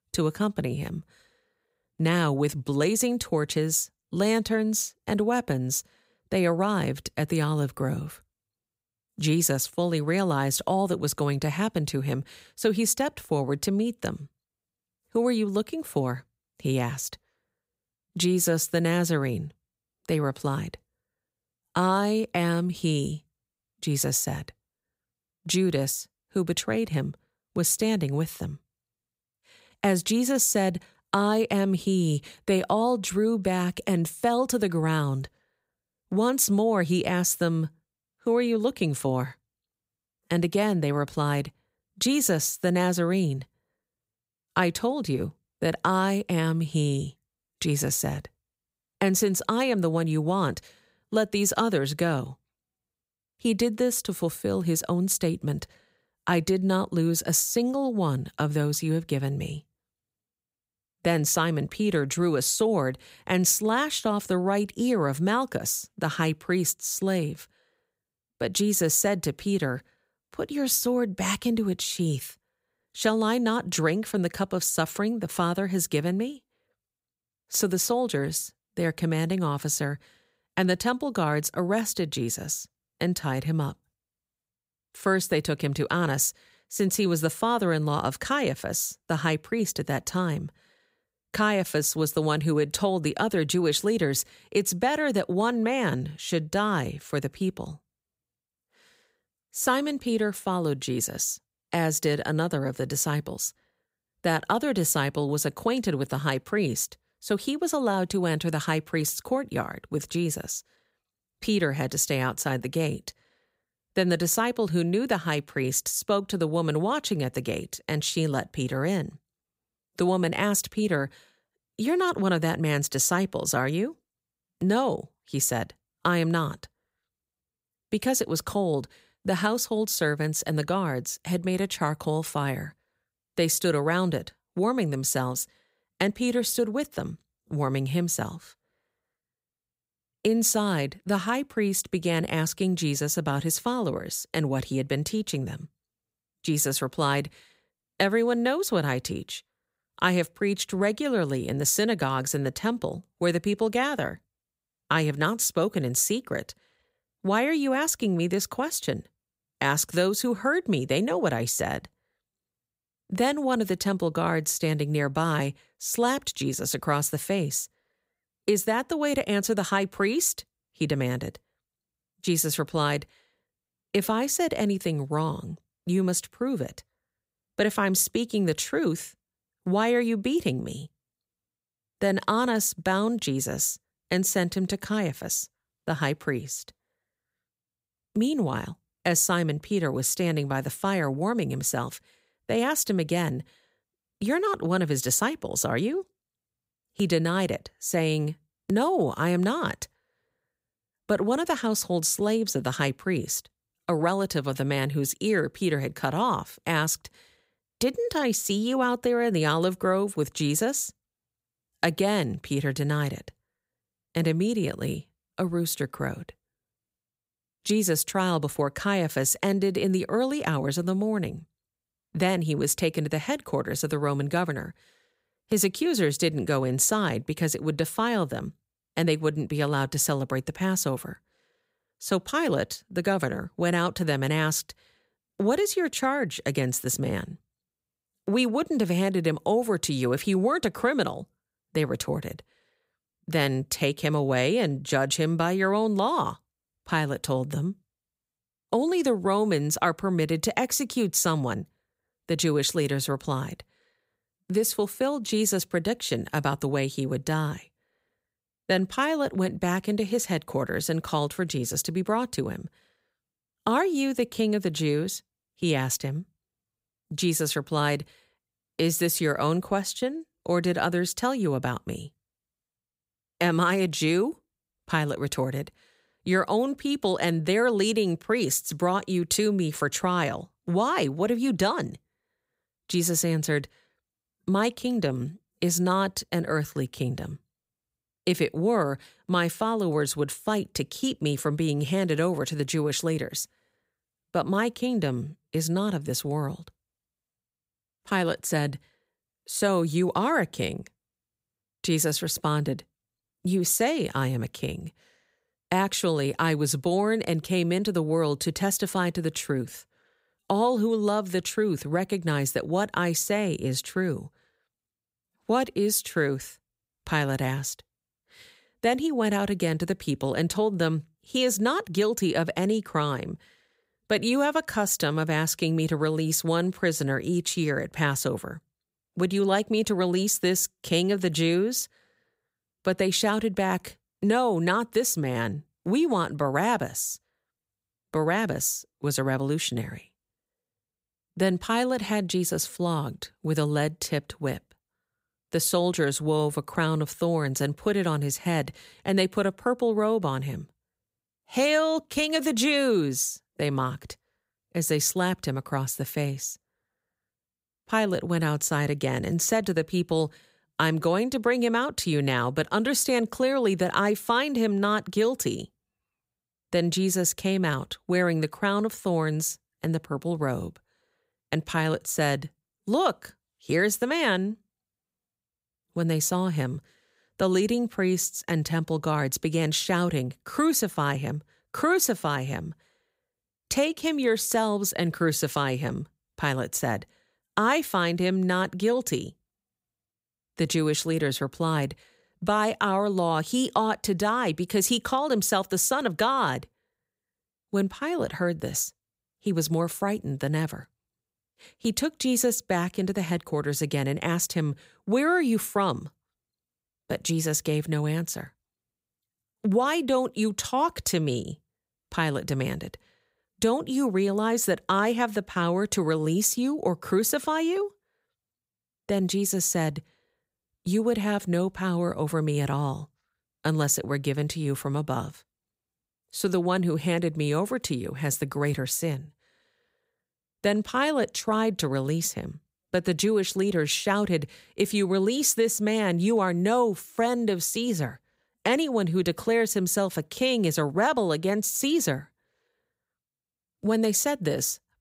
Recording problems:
none

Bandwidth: 15.5 kHz